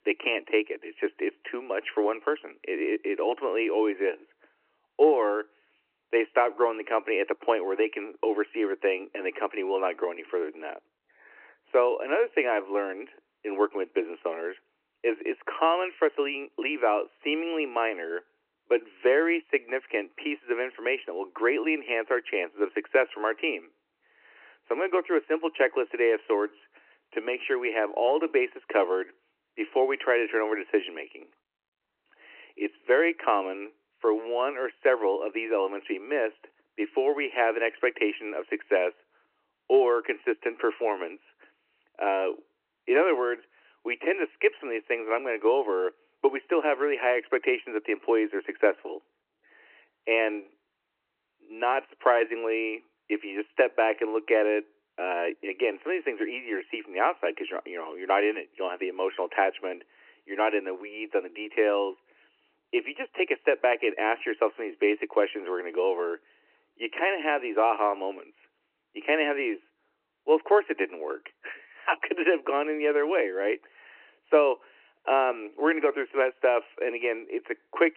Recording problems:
phone-call audio; nothing above 2.5 kHz

